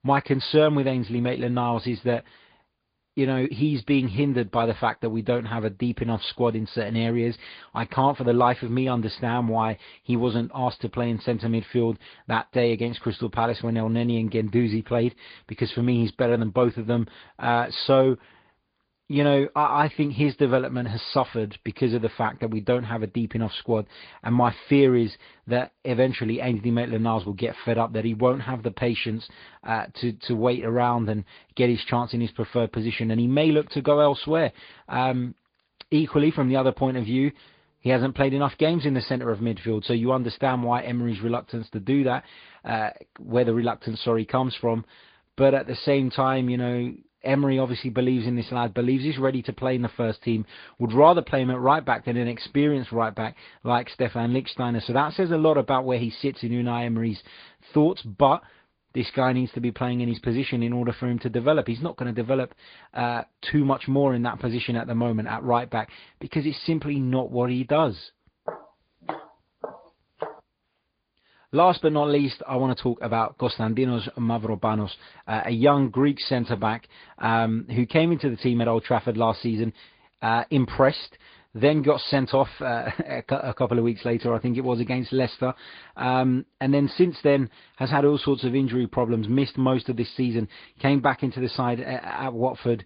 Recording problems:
high frequencies cut off; severe; nothing above 5 kHz
garbled, watery; slightly
footsteps; faint; from 1:08 to 1:10; peak 10 dB below the speech

